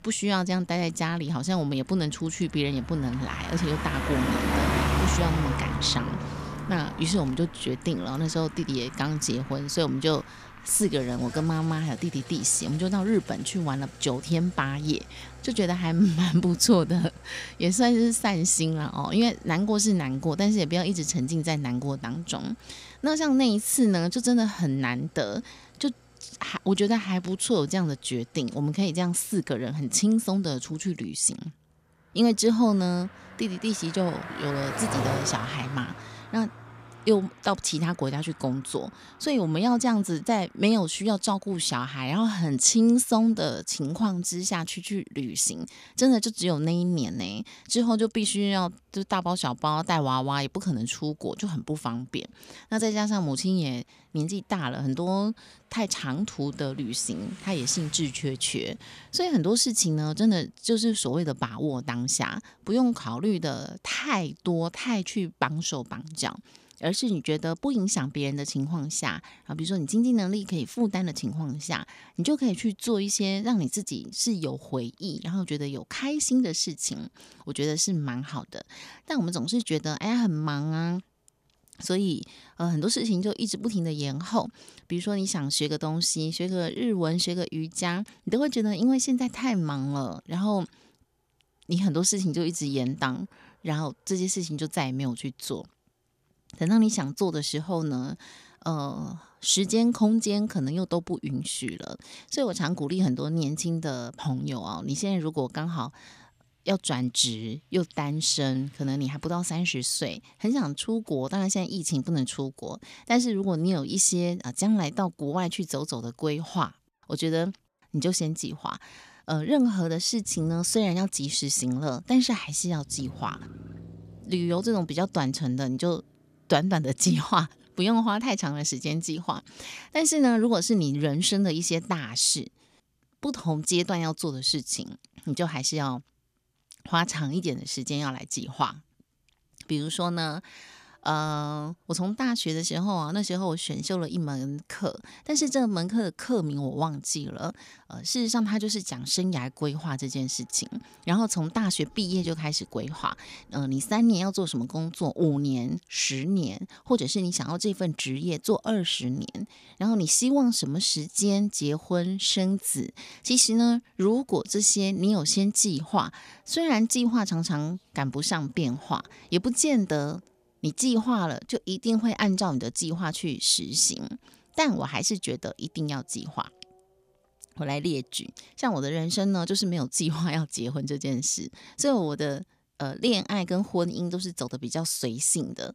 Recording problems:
traffic noise; noticeable; throughout; 10 dB below the speech

